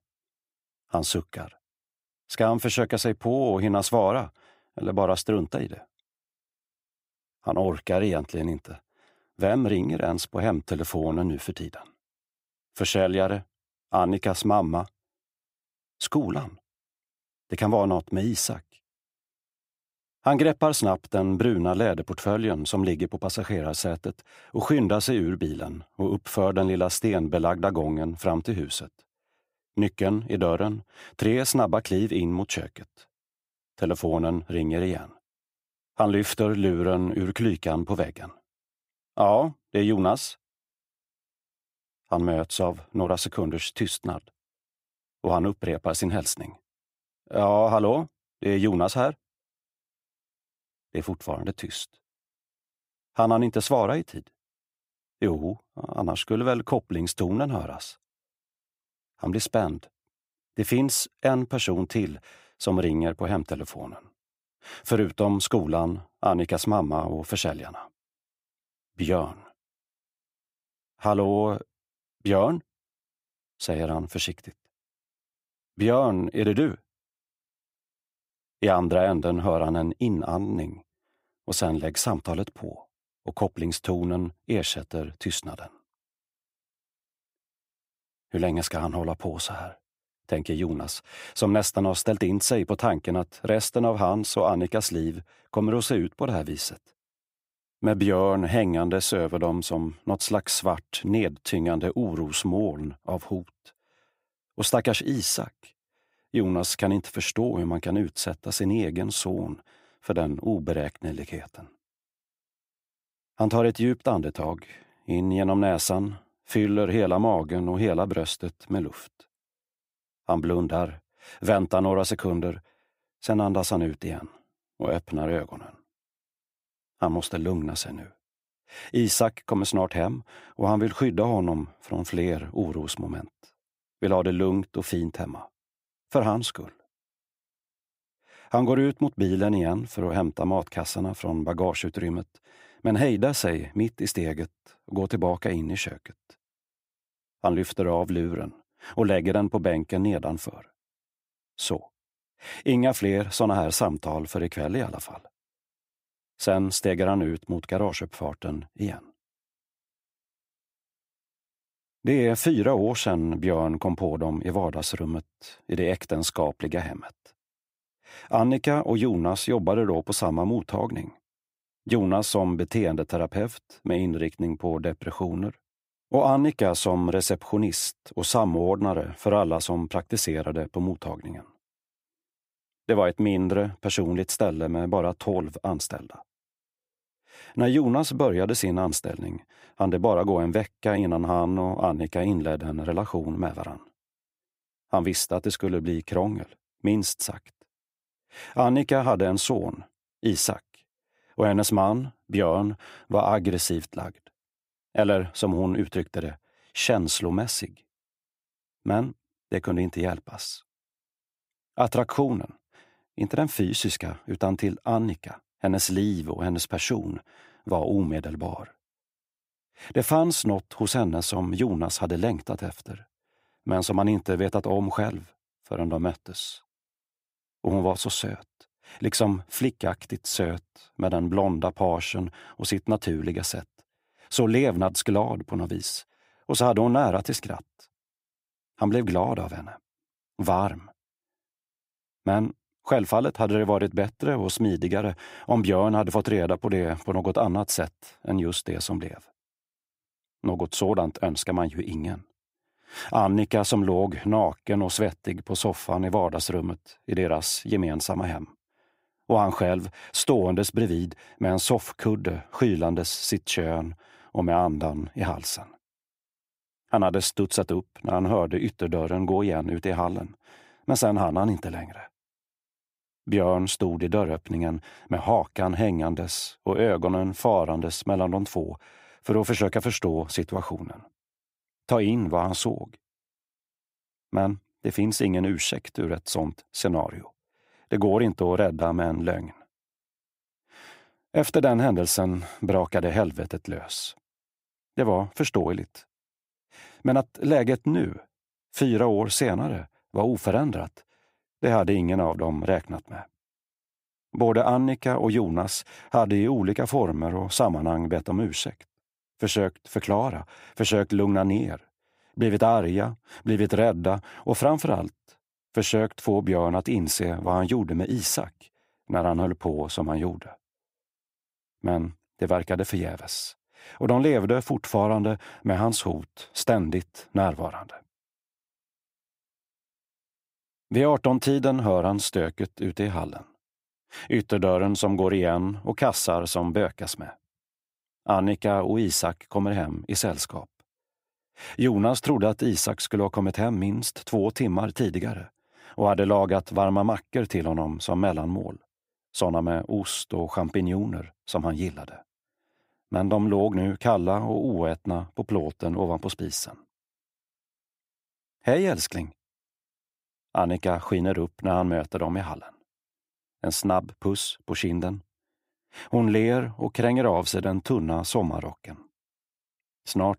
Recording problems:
none

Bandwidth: 15.5 kHz